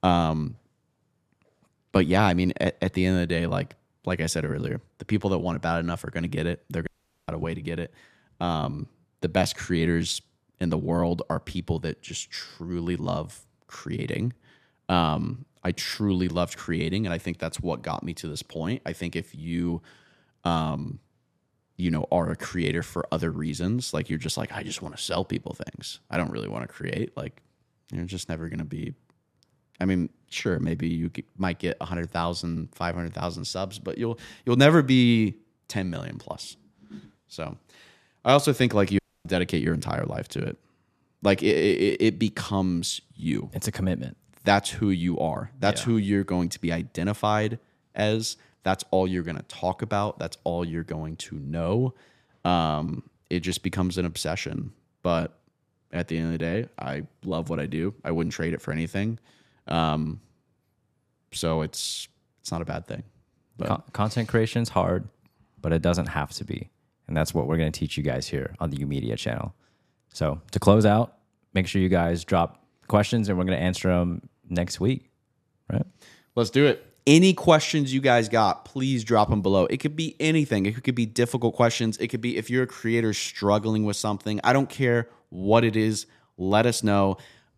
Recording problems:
audio cutting out; at 7 s and at 39 s

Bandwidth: 14.5 kHz